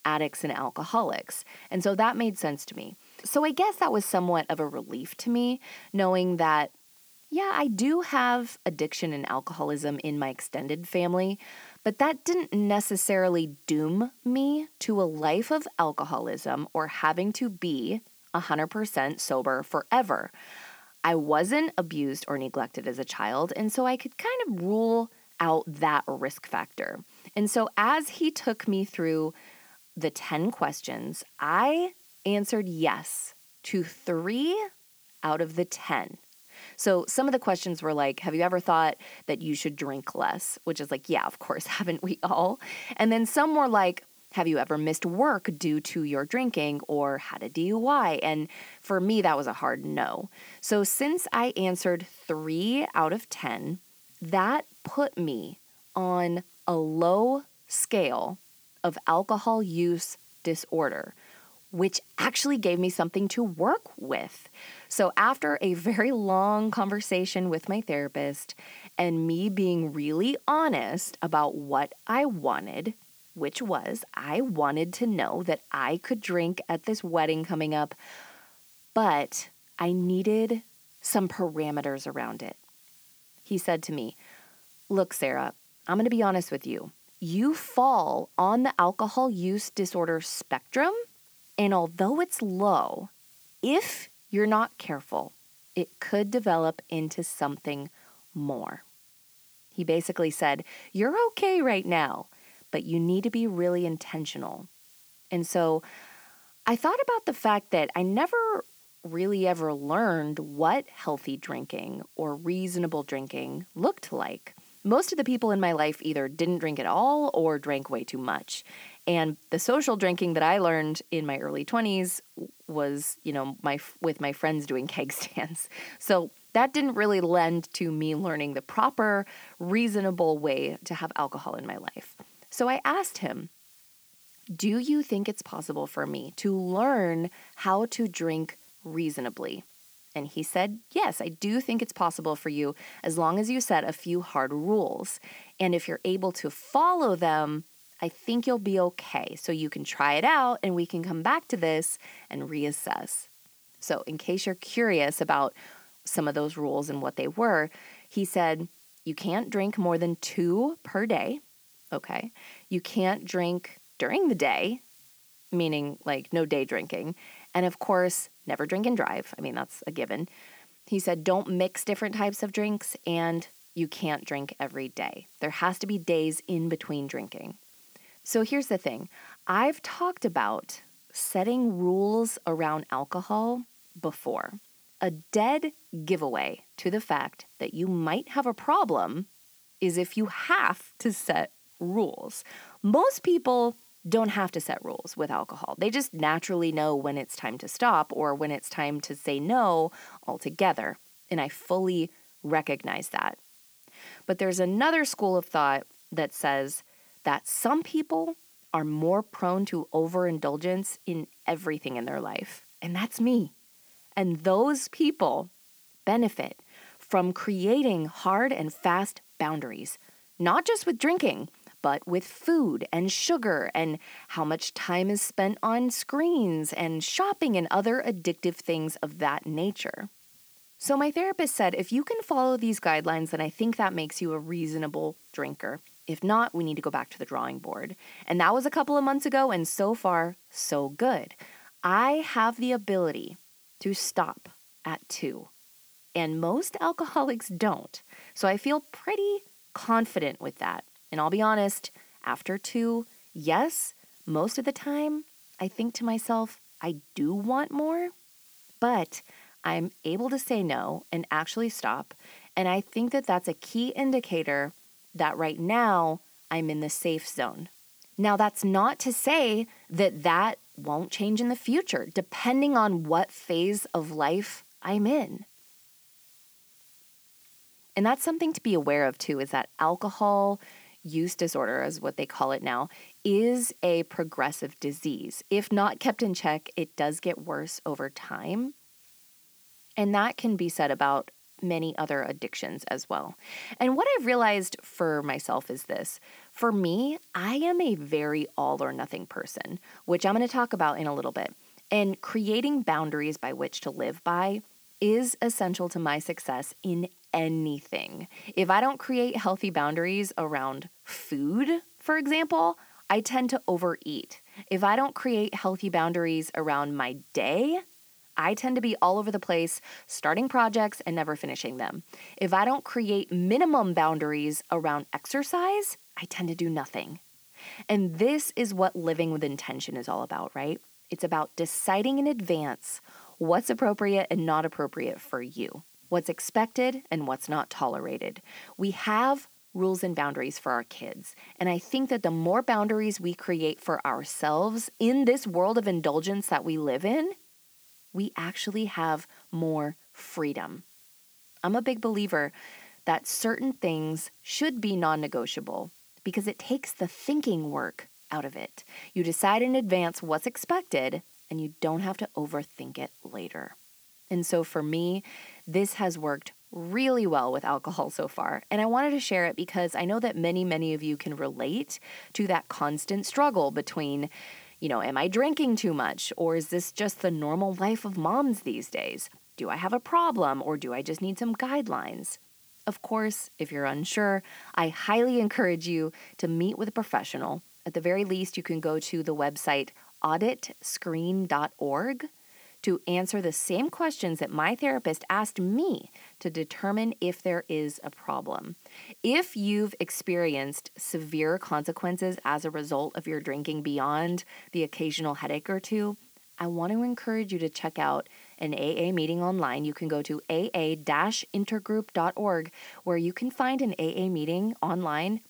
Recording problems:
hiss; faint; throughout; 25 dB below the speech

